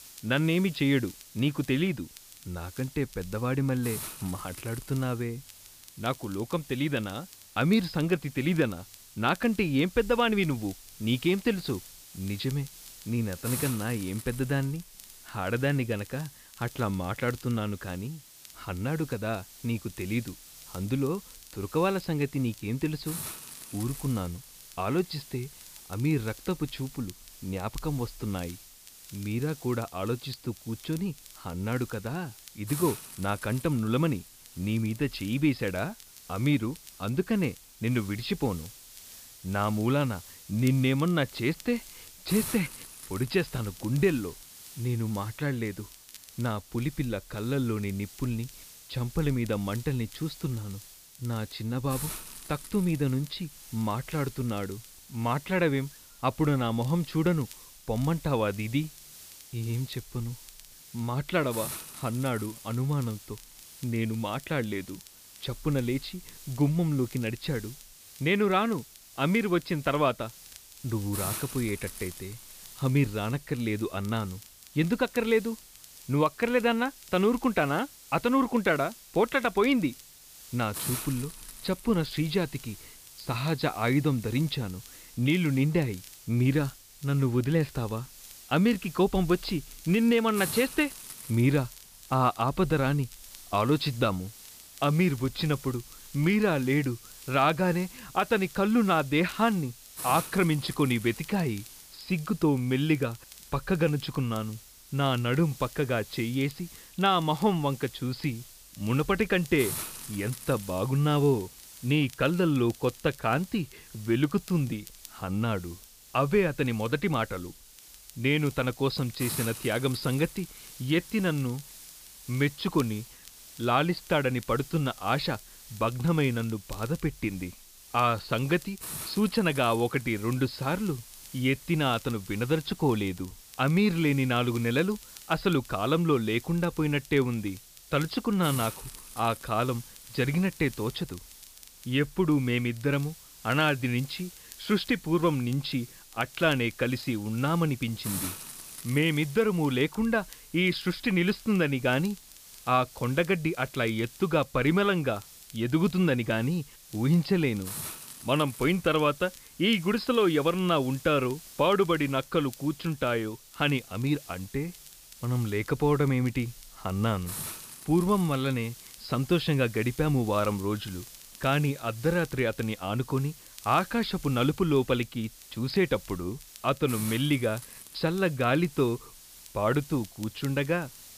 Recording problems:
high frequencies cut off; noticeable; nothing above 5.5 kHz
hiss; noticeable; throughout; 15 dB below the speech
crackle, like an old record; faint; 25 dB below the speech

